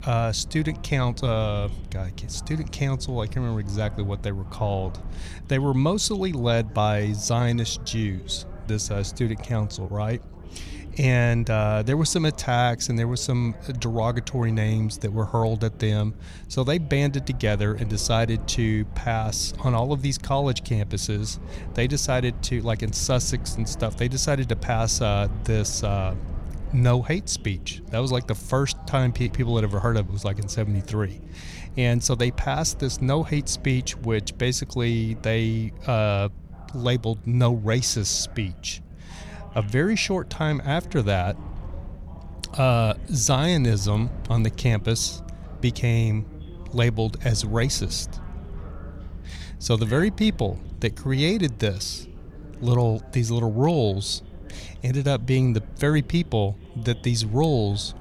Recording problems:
chatter from many people; faint; throughout; 25 dB below the speech
low rumble; faint; throughout; 25 dB below the speech

